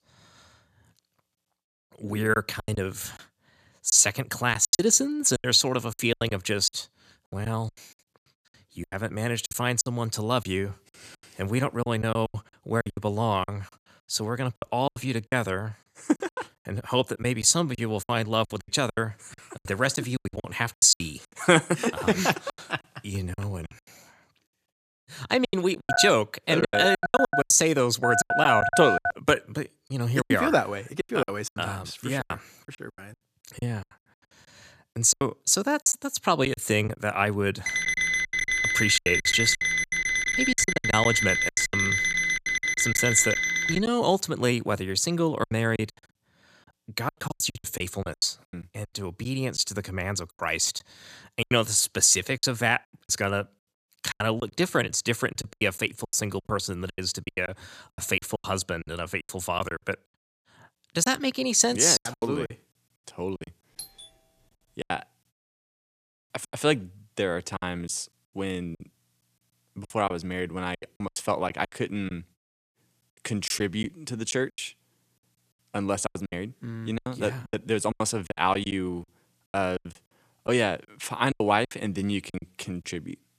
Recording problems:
choppy; very; 15% of the speech affected
phone ringing; loud; from 26 to 29 s; peak 3 dB above the speech
alarm; loud; from 38 to 44 s; peak 3 dB above the speech
doorbell; faint; at 1:04; peak 15 dB below the speech

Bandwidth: 14.5 kHz